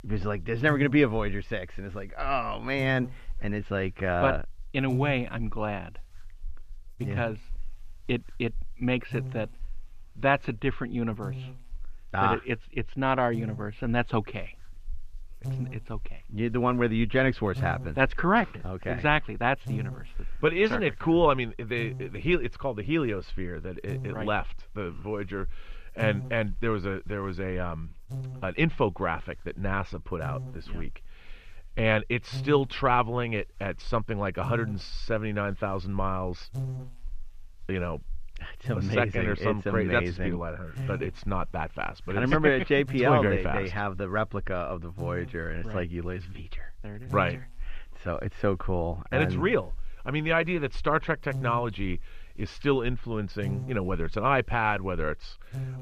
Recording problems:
muffled; very; fading above 3 kHz
electrical hum; noticeable; throughout; 50 Hz, 20 dB below the speech

